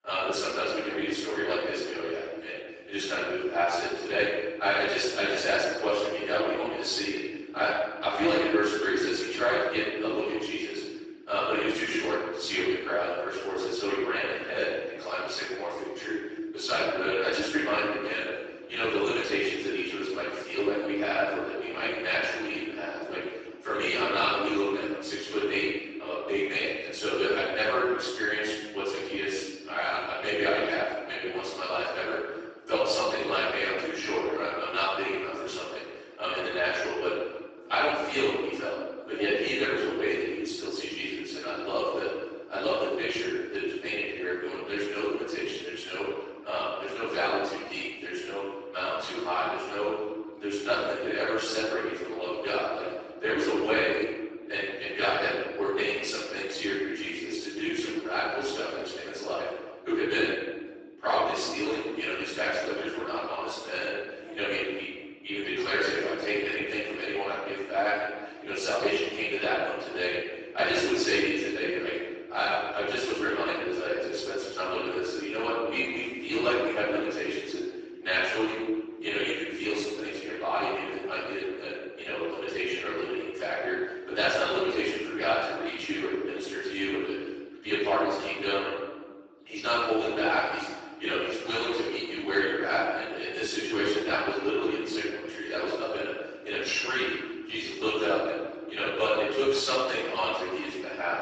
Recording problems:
room echo; strong; dies away in 1.6 s
off-mic speech; far
garbled, watery; badly; nothing above 7.5 kHz
thin; somewhat; fading below 300 Hz

